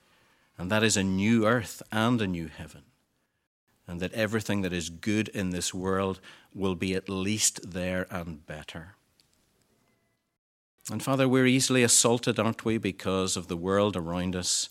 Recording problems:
none

